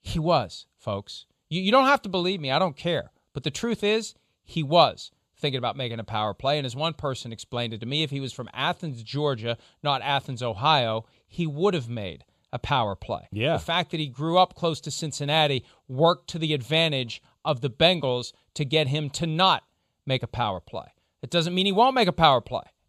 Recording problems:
none

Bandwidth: 14.5 kHz